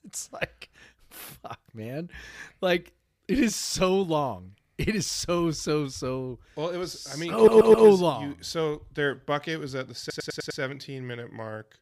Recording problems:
audio stuttering; at 7.5 s and at 10 s

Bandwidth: 15 kHz